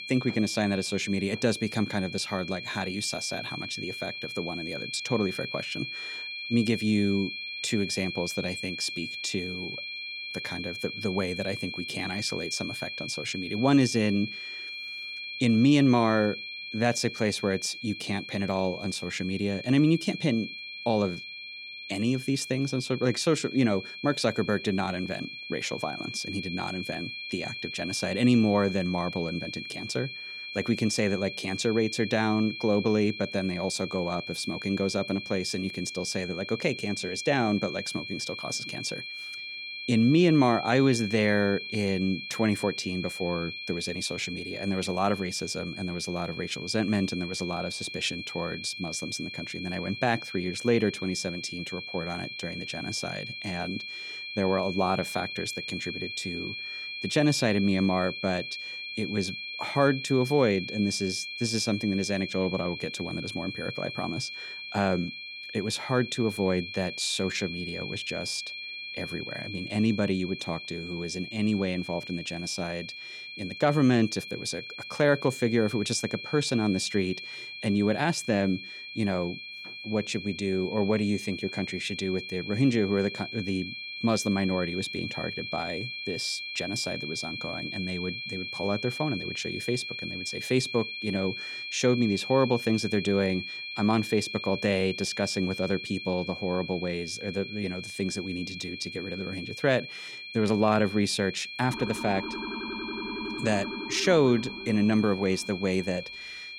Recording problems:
high-pitched whine; loud; throughout; 2.5 kHz, 7 dB below the speech
siren; noticeable; from 1:42 to 1:46; peak 7 dB below the speech

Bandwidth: 17.5 kHz